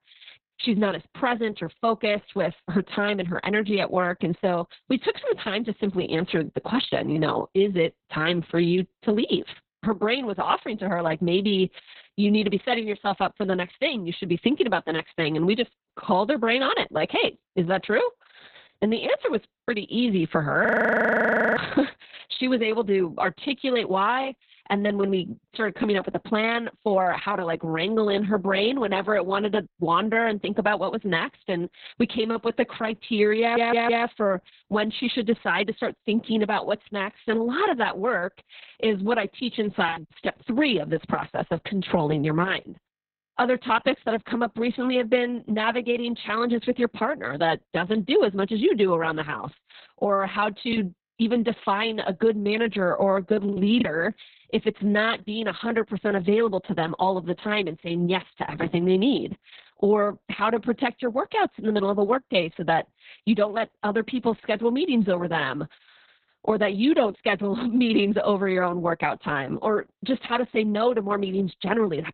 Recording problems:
garbled, watery; badly; nothing above 4 kHz
choppy; occasionally; at 20 s, at 40 s and from 51 to 54 s; 5% of the speech affected
audio freezing; at 21 s for 1 s
audio stuttering; at 33 s

